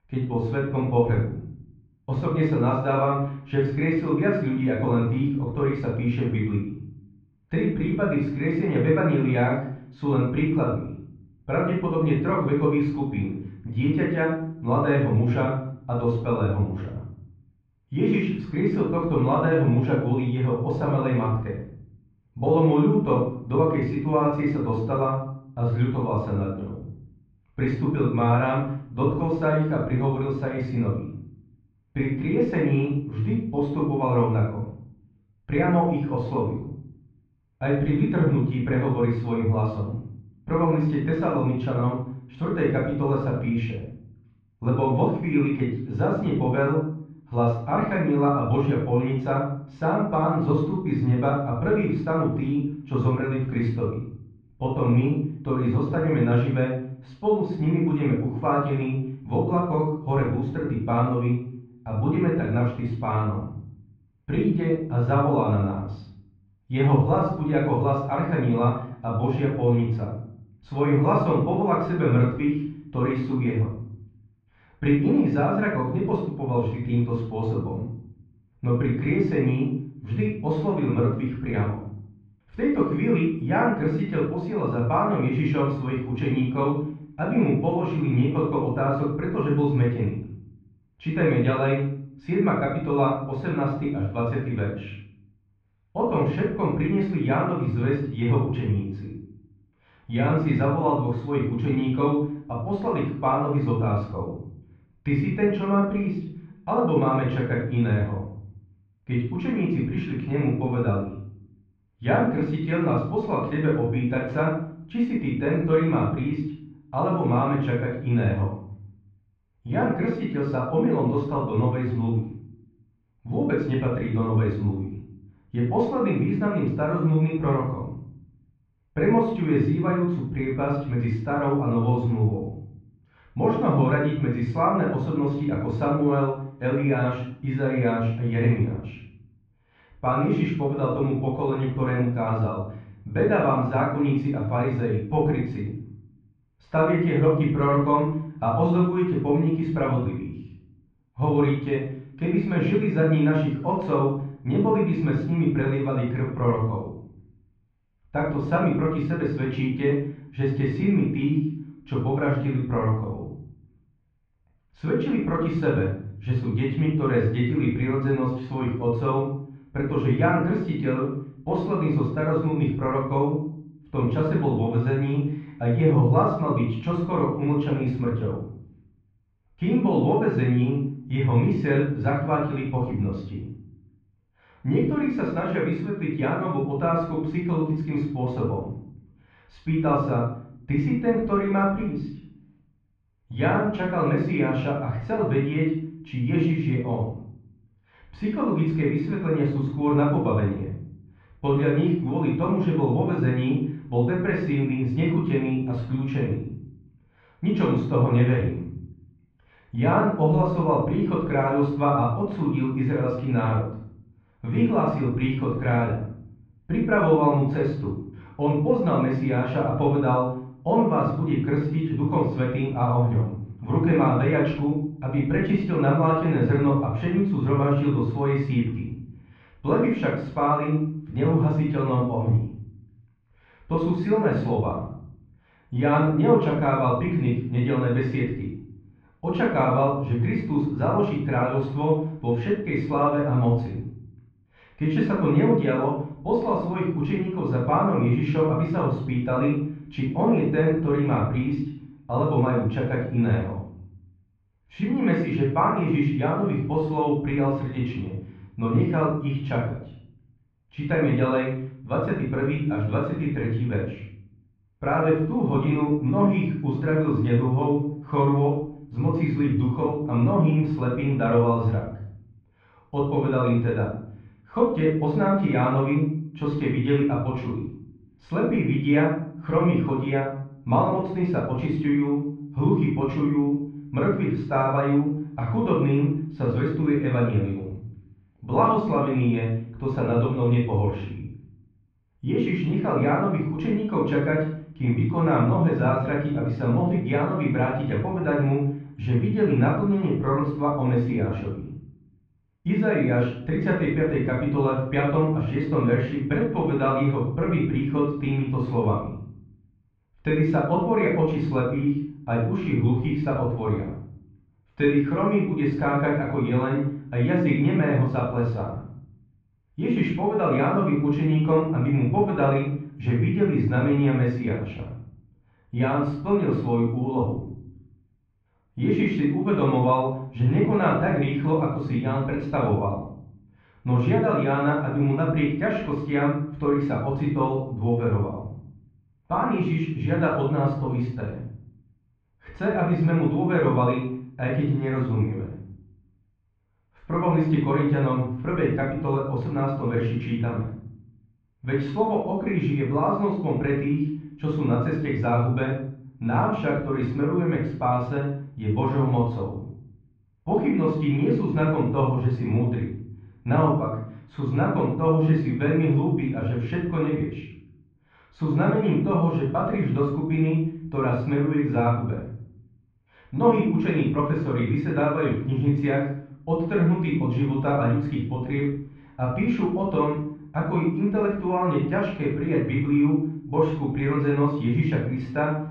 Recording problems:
off-mic speech; far
muffled; very; fading above 2.5 kHz
room echo; noticeable; dies away in 0.6 s

